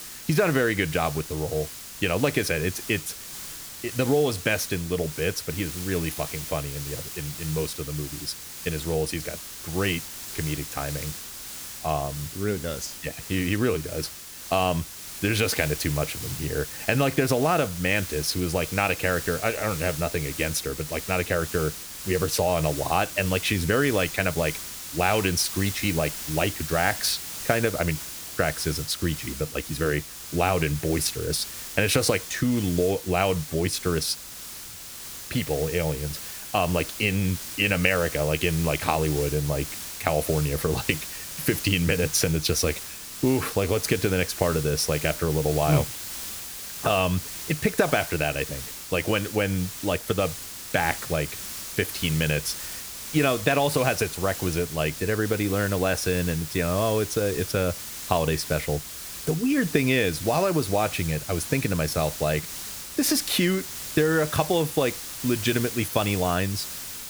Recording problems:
hiss; loud; throughout; 8 dB below the speech

